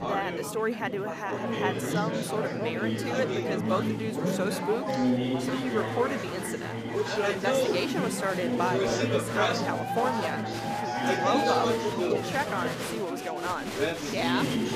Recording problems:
chatter from many people; very loud; throughout; 3 dB above the speech

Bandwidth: 15 kHz